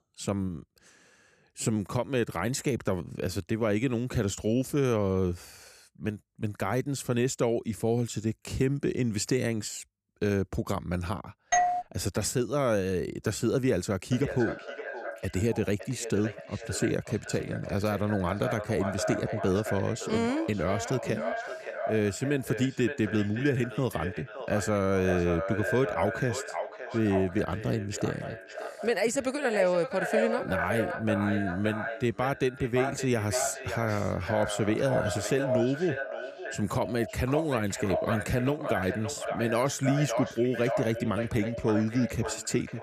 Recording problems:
echo of what is said; strong; from 14 s on; 570 ms later, 6 dB below the speech
doorbell; loud; at 12 s; peak 4 dB above the speech

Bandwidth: 14.5 kHz